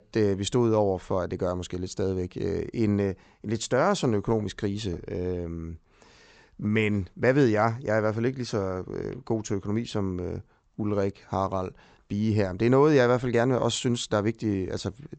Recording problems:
high frequencies cut off; noticeable; nothing above 8 kHz

